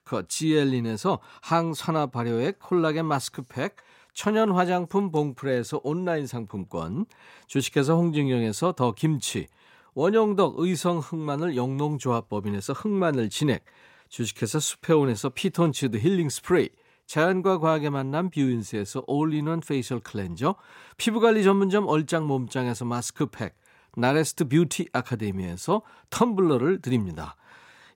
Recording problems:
none

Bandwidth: 16 kHz